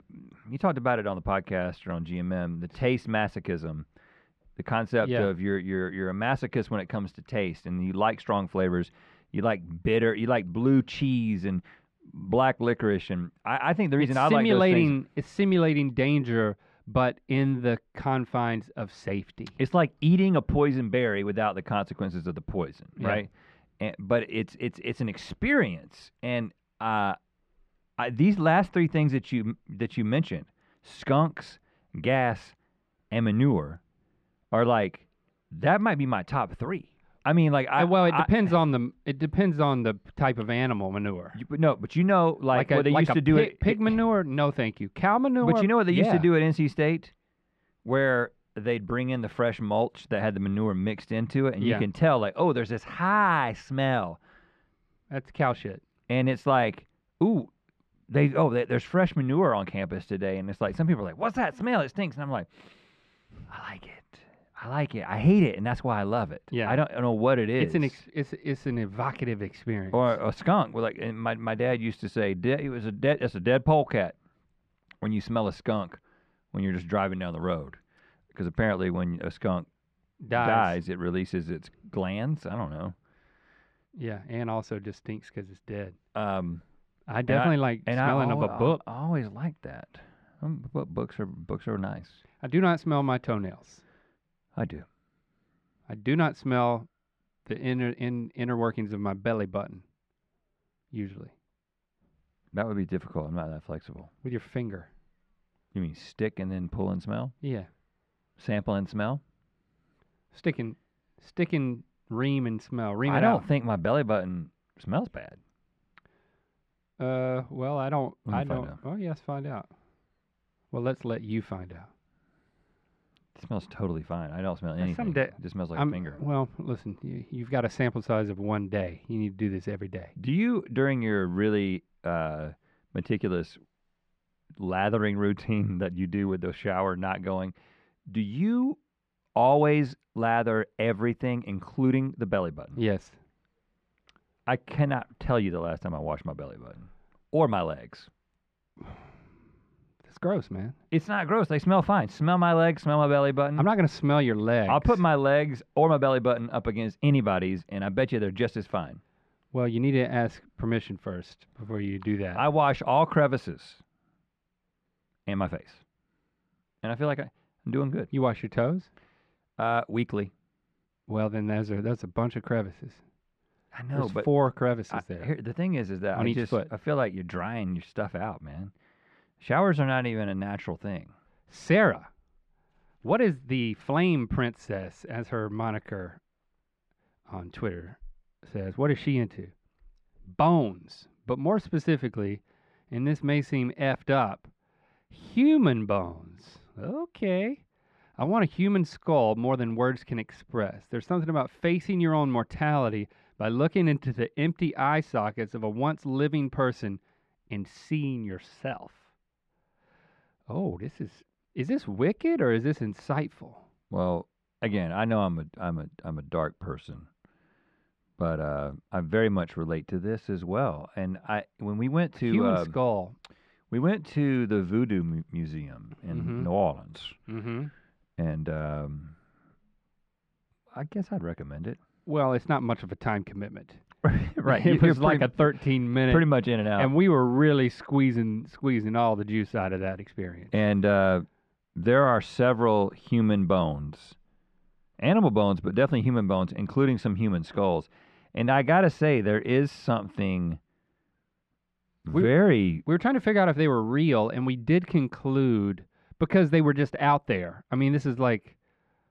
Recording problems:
muffled; slightly; fading above 2 kHz

